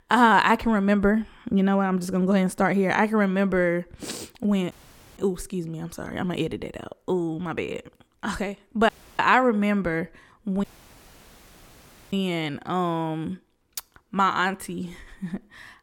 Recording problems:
audio cutting out; at 4.5 s, at 9 s and at 11 s for 1.5 s

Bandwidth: 18 kHz